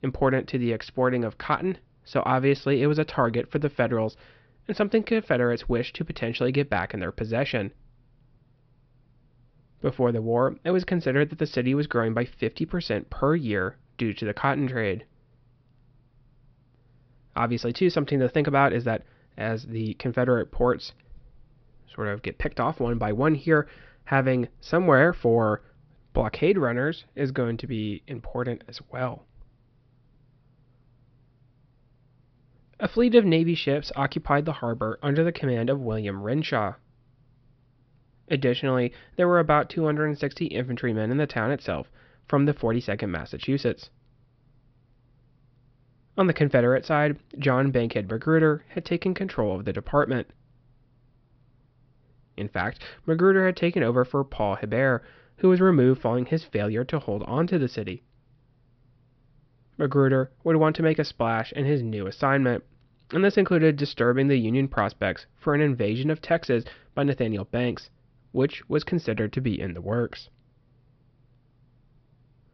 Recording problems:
high frequencies cut off; noticeable; nothing above 5.5 kHz

